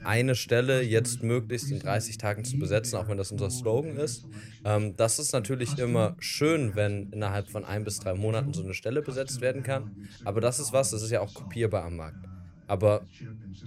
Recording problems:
voice in the background; noticeable; throughout; 10 dB below the speech

